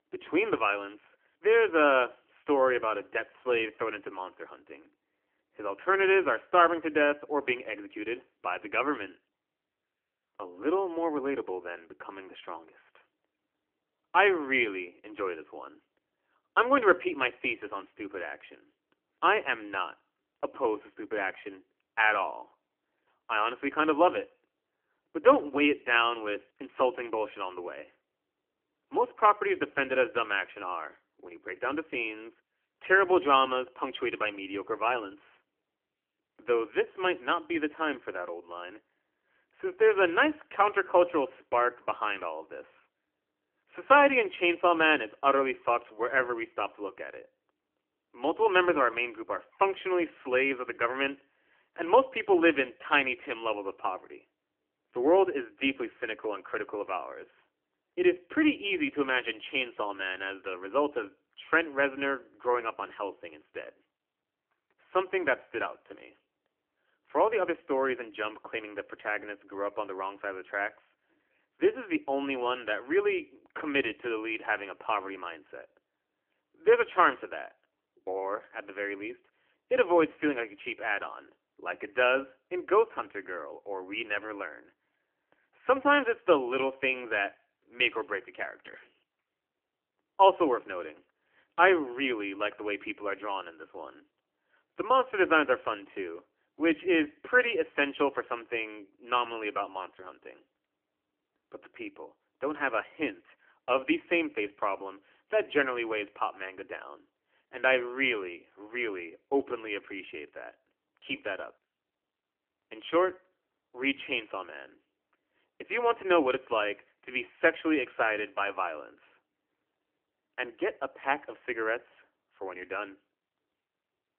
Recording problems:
phone-call audio; nothing above 3 kHz

